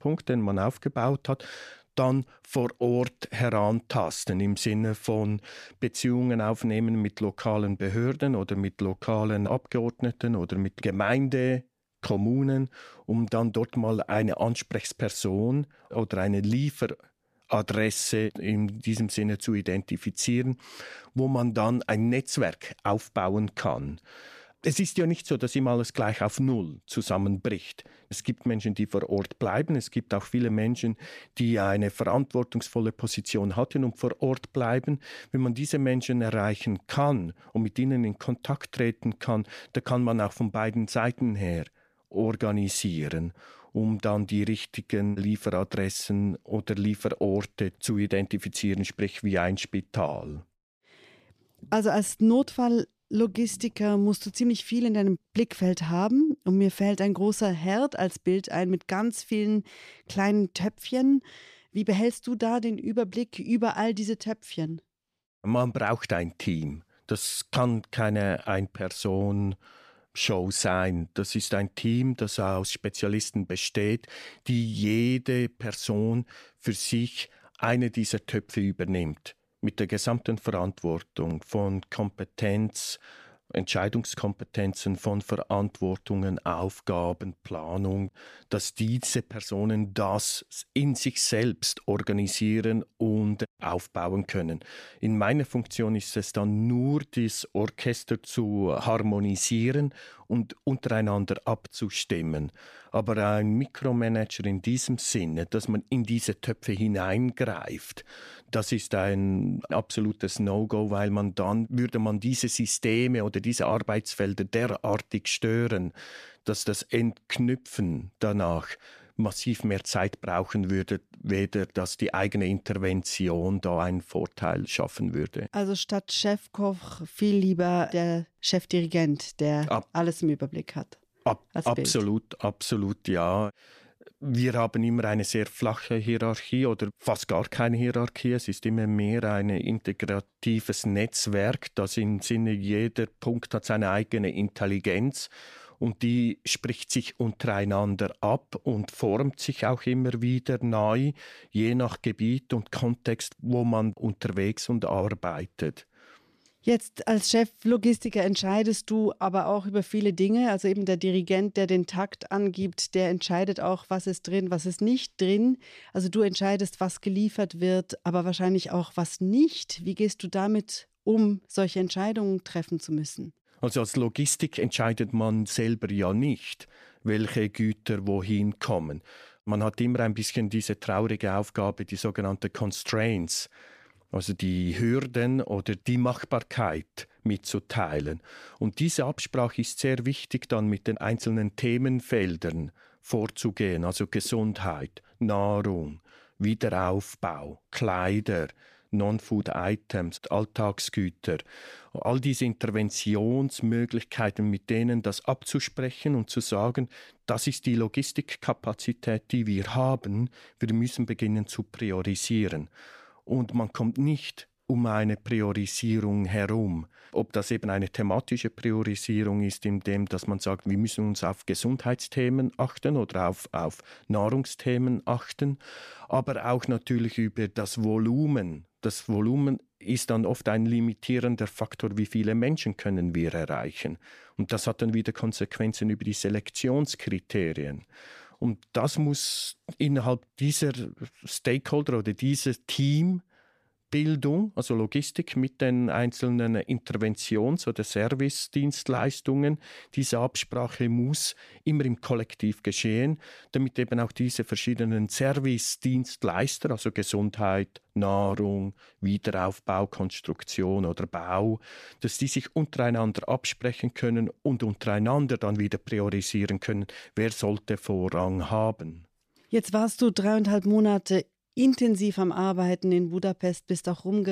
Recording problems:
abrupt cut into speech; at the end

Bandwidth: 14.5 kHz